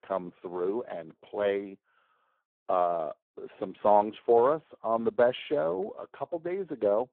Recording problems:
phone-call audio; poor line

